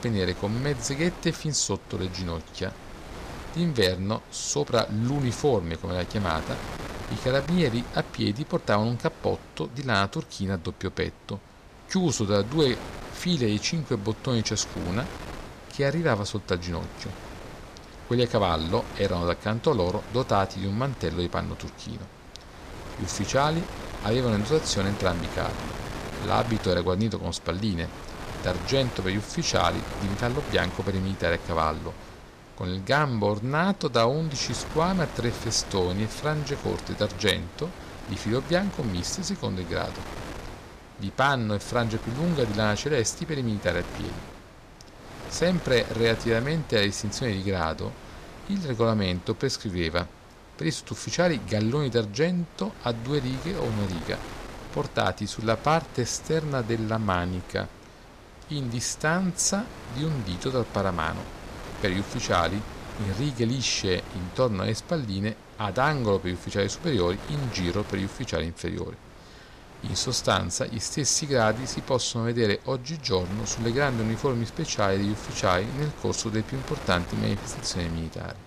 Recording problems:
wind noise on the microphone; occasional gusts; 15 dB below the speech

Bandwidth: 14.5 kHz